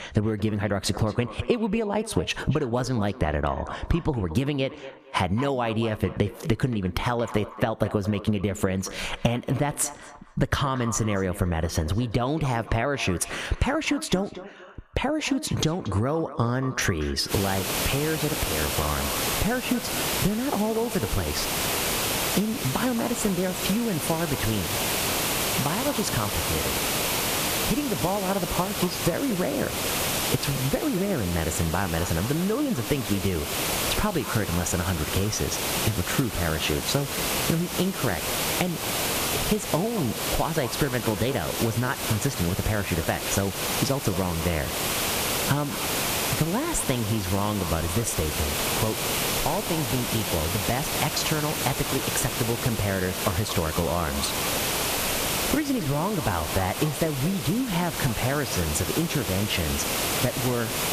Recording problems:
echo of what is said; noticeable; throughout; 230 ms later, 15 dB below the speech
squashed, flat; somewhat
hiss; loud; from 17 s on; as loud as the speech

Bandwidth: 14.5 kHz